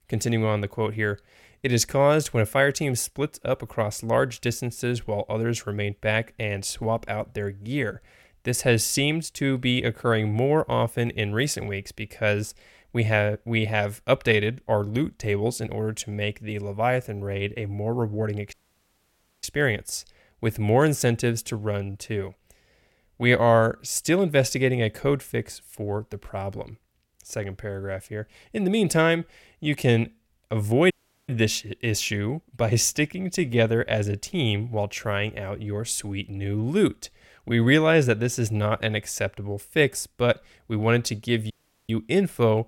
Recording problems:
audio cutting out; at 19 s for 1 s, at 31 s and at 42 s

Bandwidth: 16.5 kHz